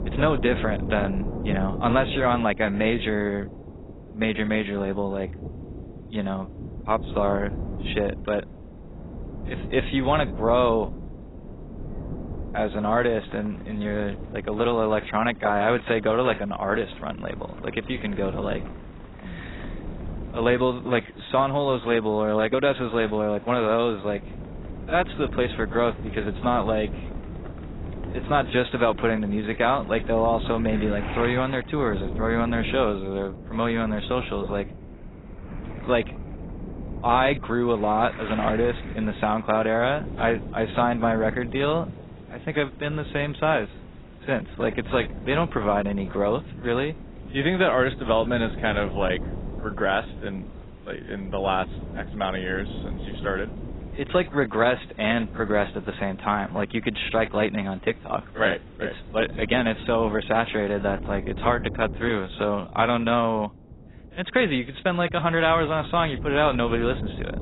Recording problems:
garbled, watery; badly; nothing above 4 kHz
rain or running water; noticeable; throughout; 20 dB below the speech
wind noise on the microphone; occasional gusts; 20 dB below the speech

